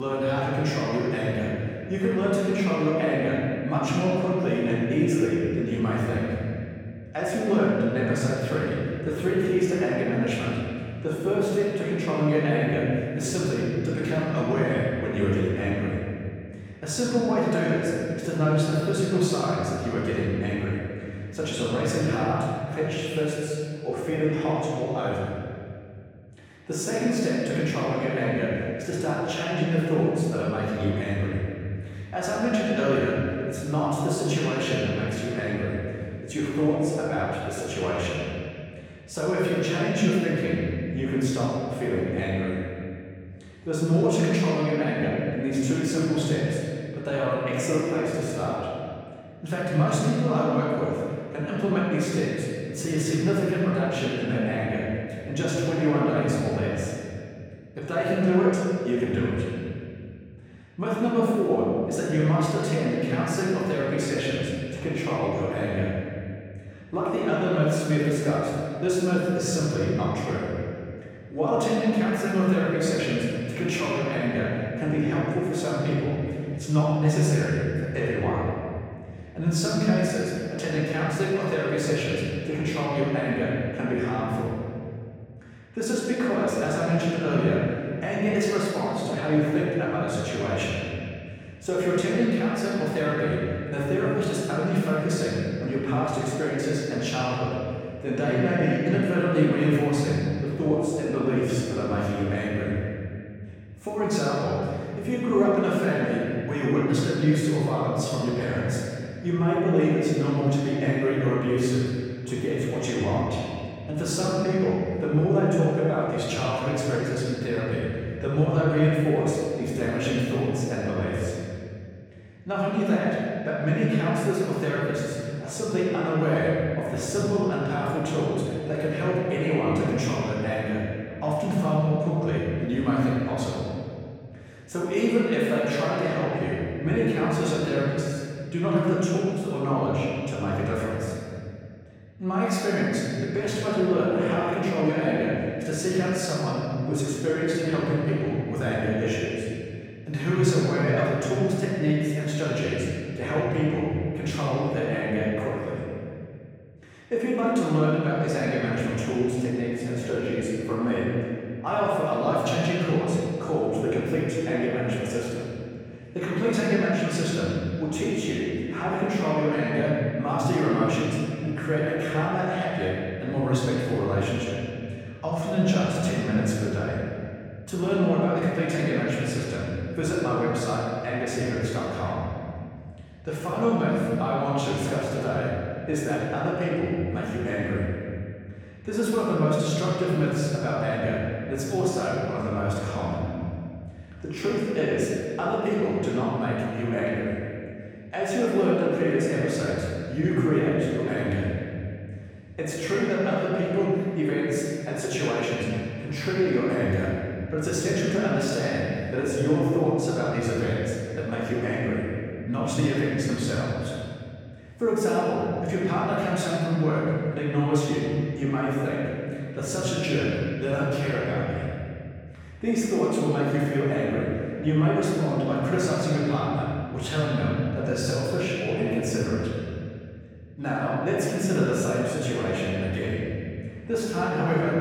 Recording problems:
room echo; strong; dies away in 2.4 s
off-mic speech; far
abrupt cut into speech; at the start

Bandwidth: 18 kHz